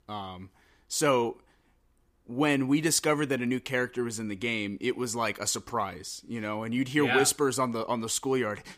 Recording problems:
none

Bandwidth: 15 kHz